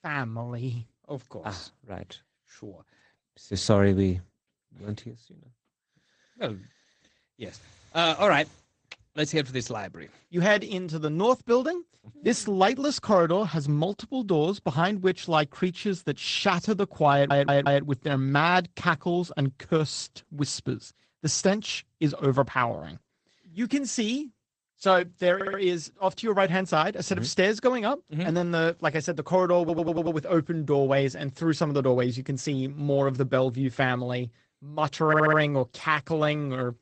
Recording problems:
garbled, watery; slightly; nothing above 8 kHz
audio stuttering; 4 times, first at 17 s

